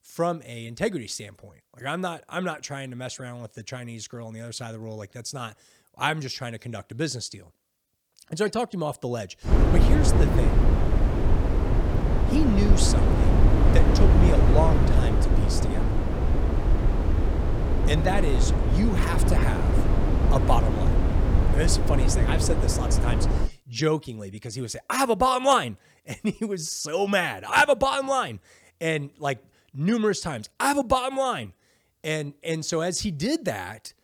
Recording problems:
wind noise on the microphone; heavy; from 9.5 to 23 s; 4 dB below the speech

